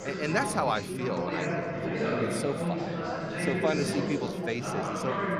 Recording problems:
chatter from many people; very loud; throughout; 1 dB above the speech

